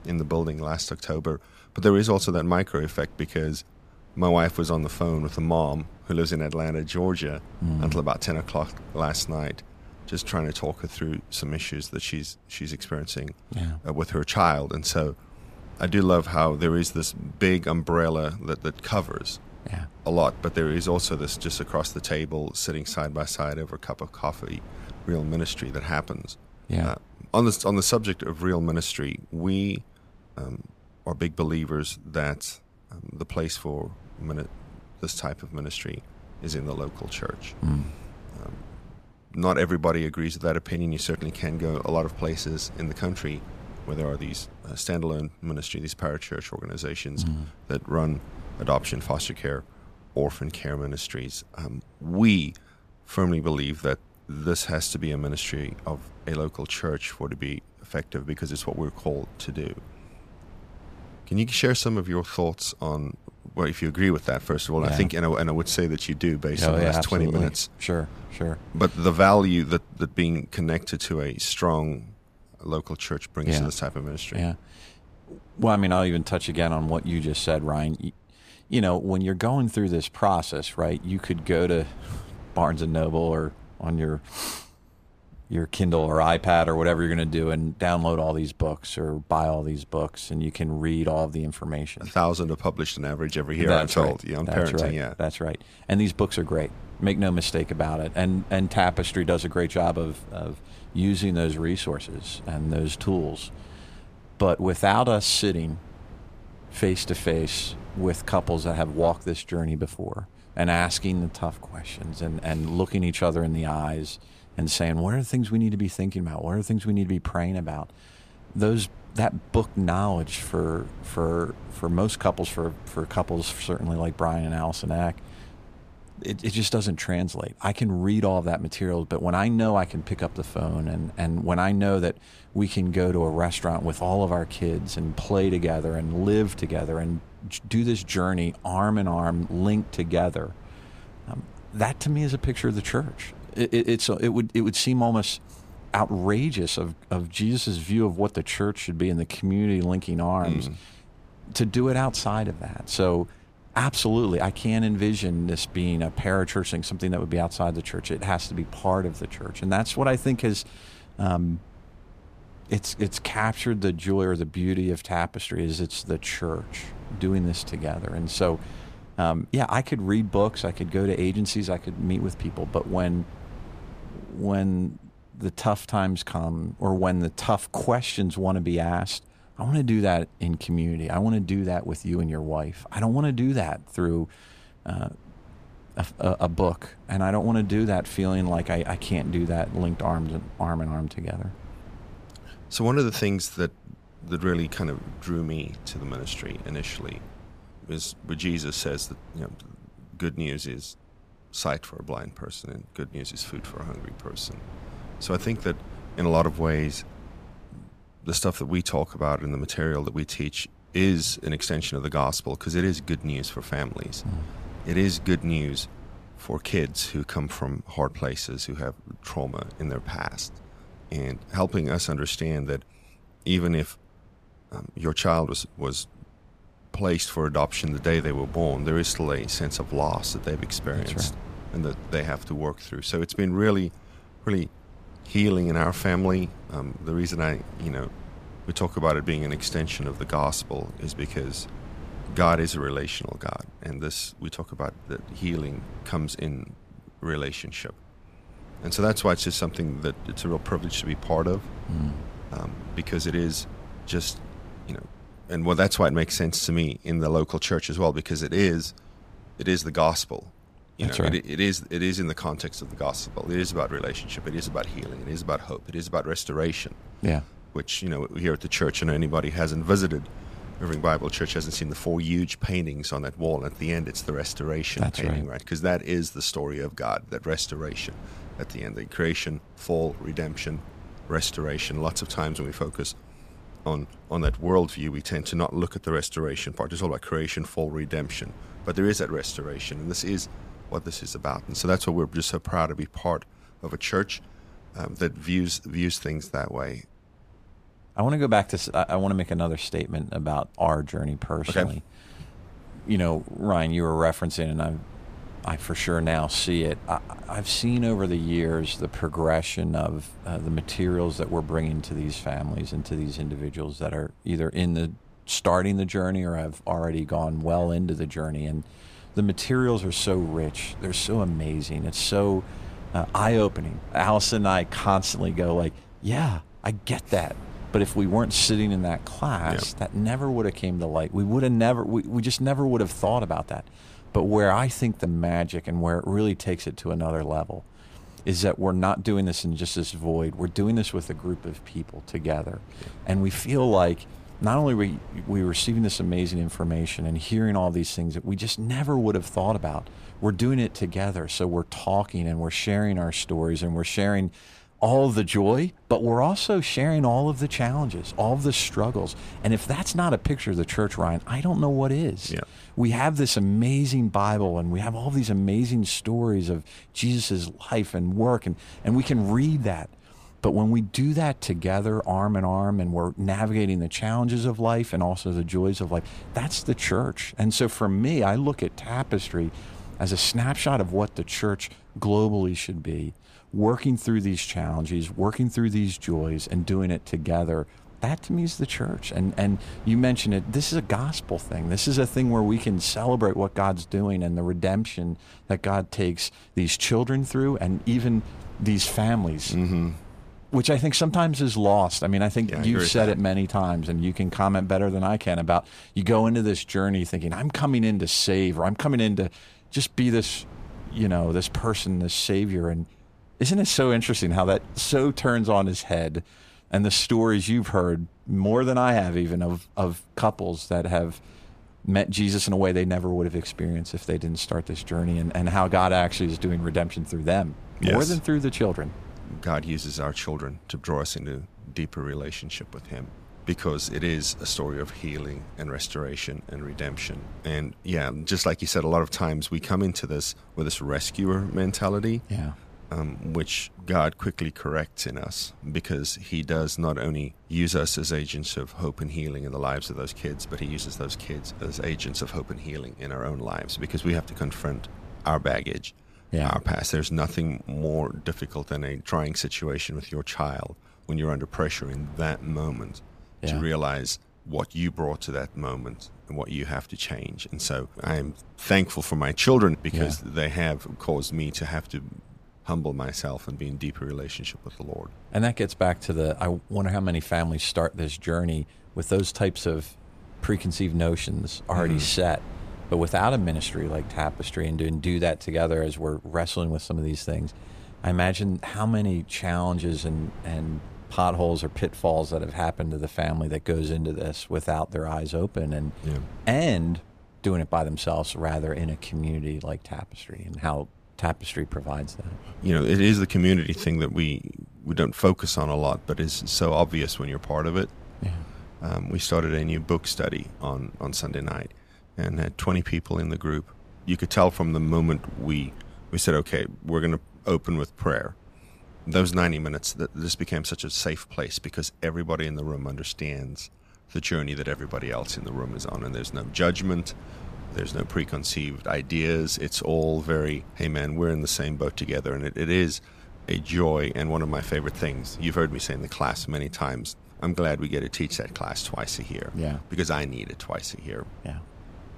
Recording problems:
wind noise on the microphone; occasional gusts; 25 dB below the speech

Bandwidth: 14.5 kHz